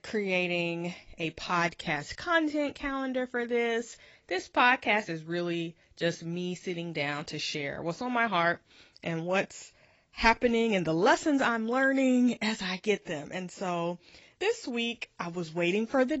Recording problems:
garbled, watery; badly; nothing above 7.5 kHz
abrupt cut into speech; at the end

